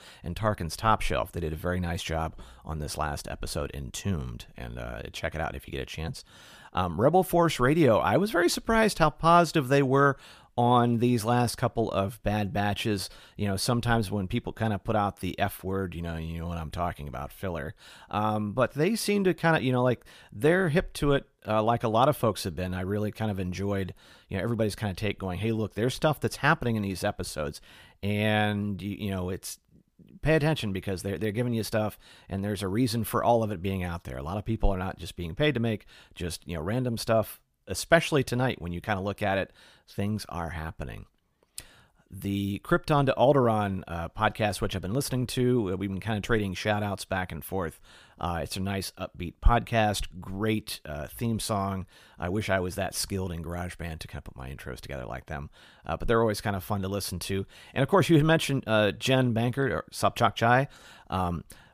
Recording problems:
none

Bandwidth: 15 kHz